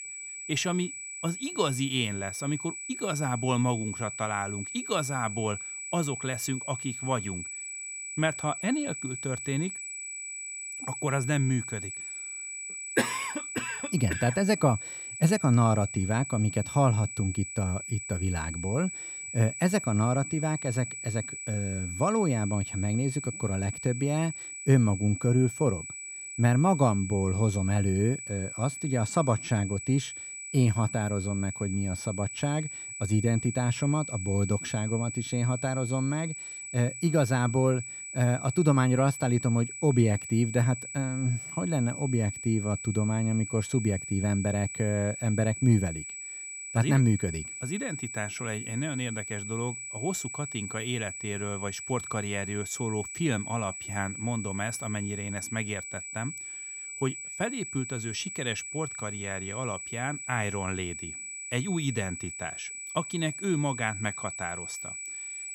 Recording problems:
high-pitched whine; loud; throughout; 8 kHz, 7 dB below the speech

